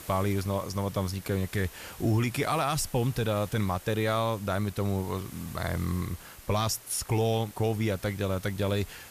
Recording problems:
hiss; noticeable; throughout; 15 dB below the speech

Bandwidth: 14.5 kHz